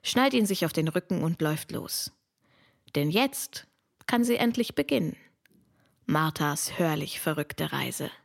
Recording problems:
none

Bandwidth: 16.5 kHz